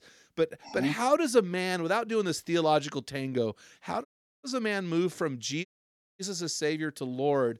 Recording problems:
audio cutting out; at 4 s and at 5.5 s for 0.5 s

